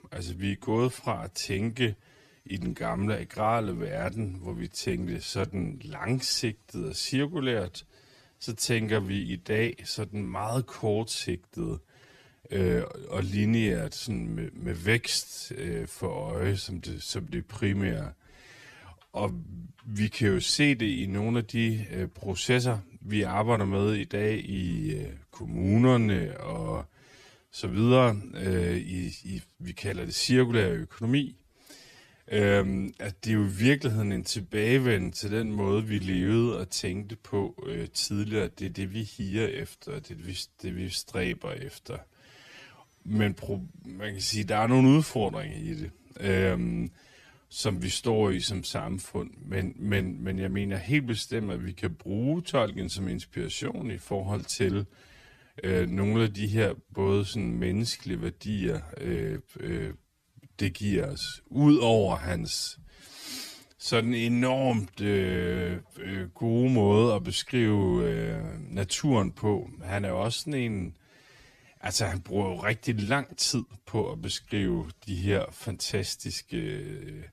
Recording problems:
wrong speed, natural pitch; too slow; 0.6 times normal speed

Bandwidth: 14 kHz